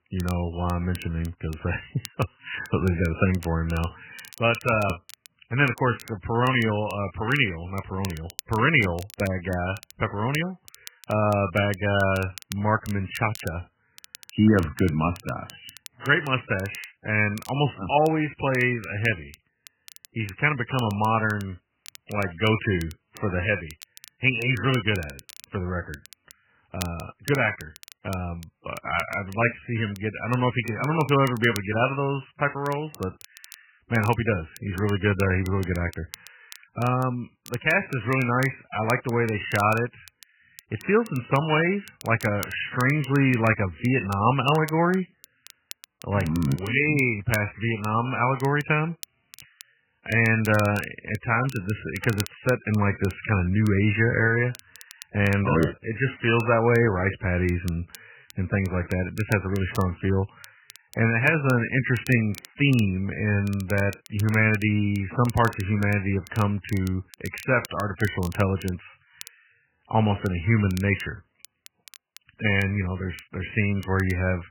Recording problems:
garbled, watery; badly; nothing above 3 kHz
crackle, like an old record; faint; 20 dB below the speech

